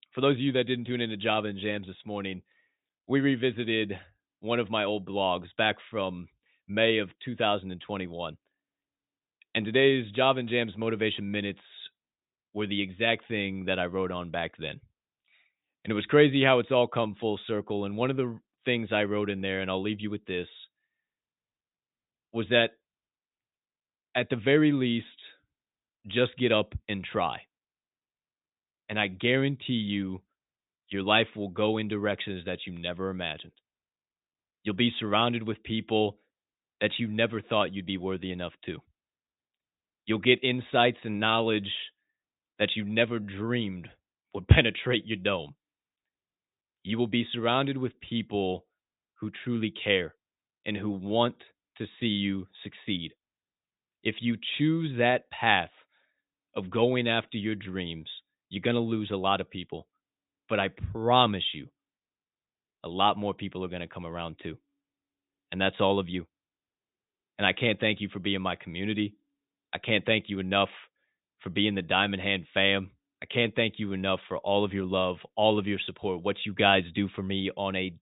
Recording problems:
high frequencies cut off; severe; nothing above 4 kHz

